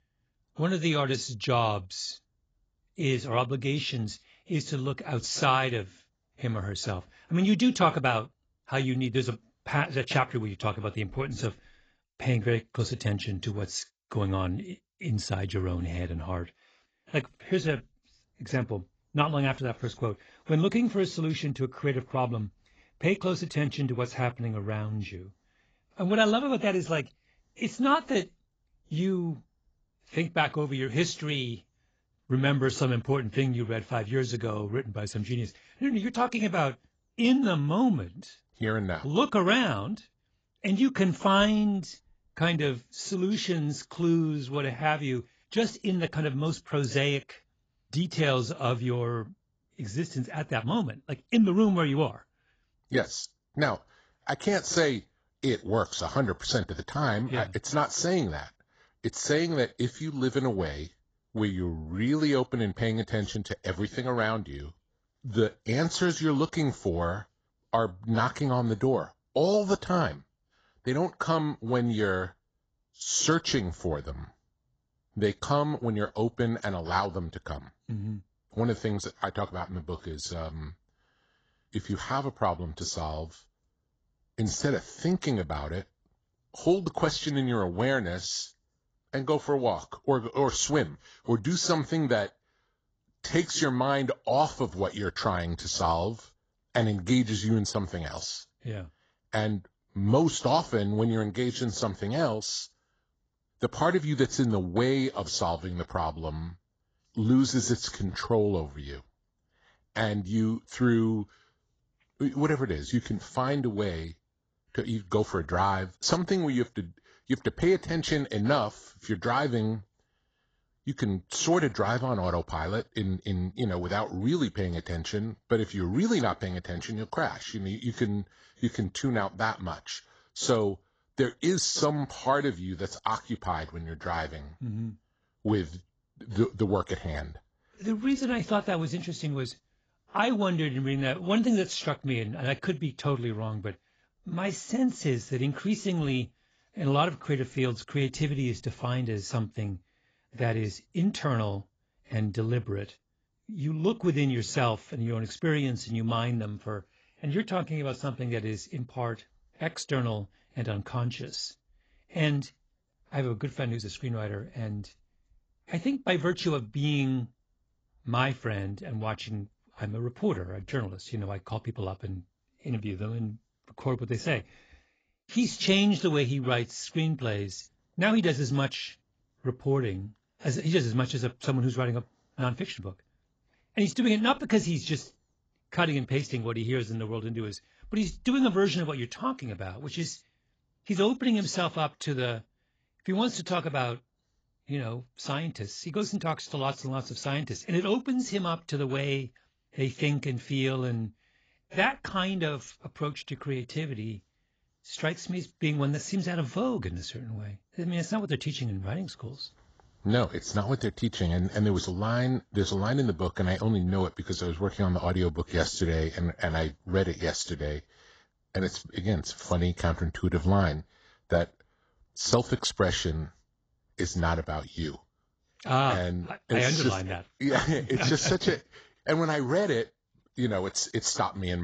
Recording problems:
garbled, watery; badly; nothing above 7.5 kHz
abrupt cut into speech; at the end

